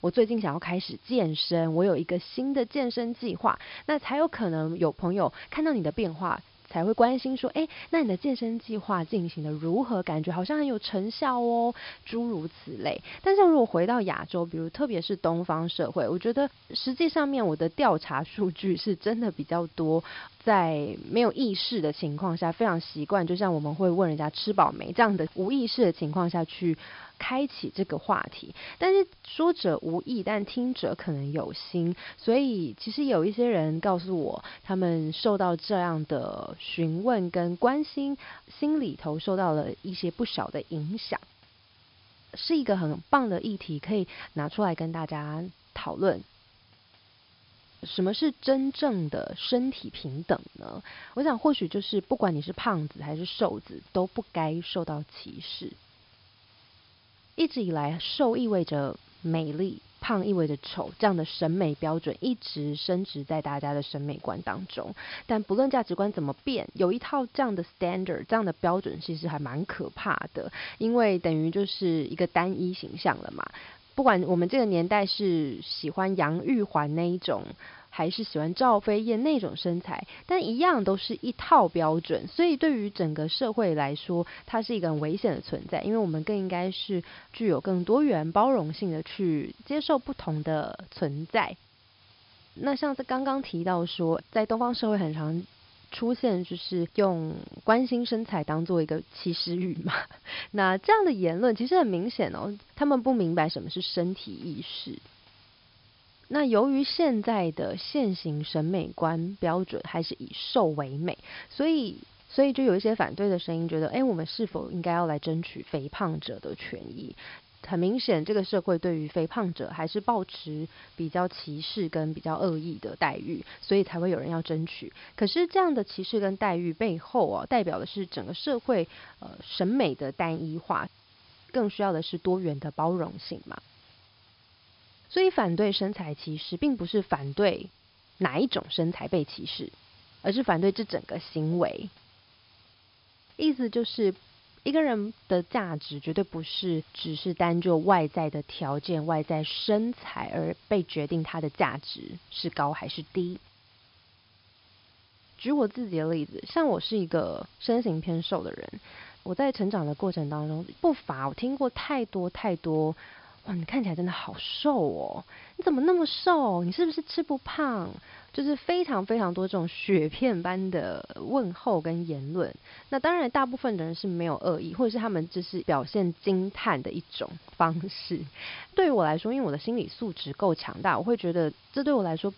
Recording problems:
high frequencies cut off; noticeable; nothing above 5.5 kHz
hiss; faint; throughout; 30 dB below the speech

